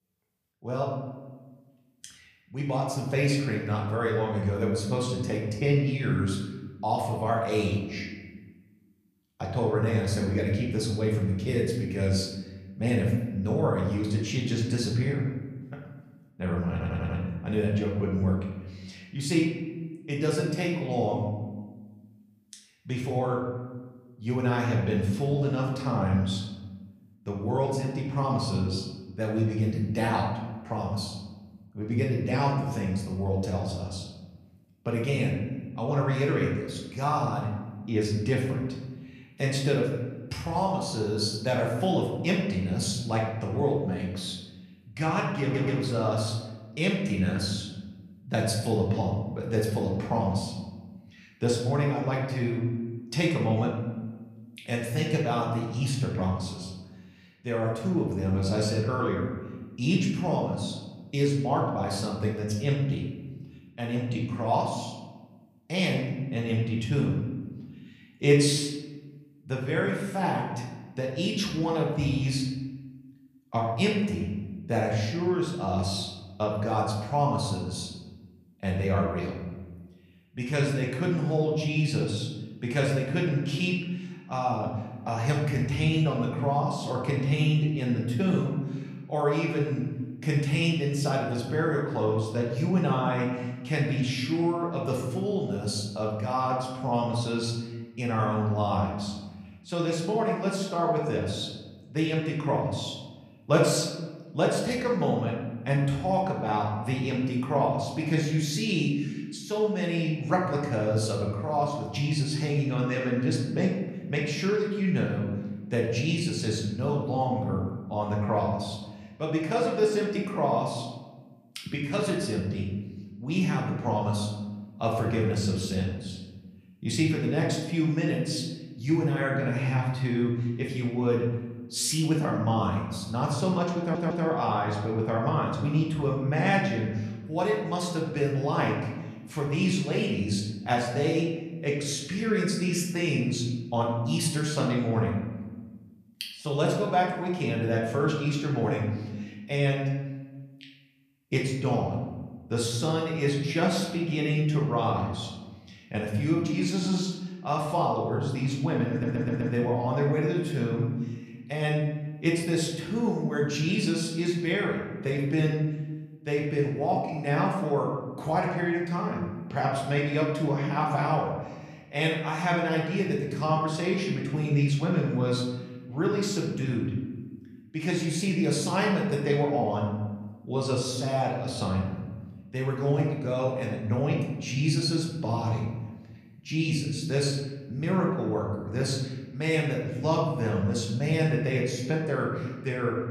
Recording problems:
off-mic speech; far
room echo; noticeable; dies away in 1.1 s
audio stuttering; 4 times, first at 17 s

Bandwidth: 15 kHz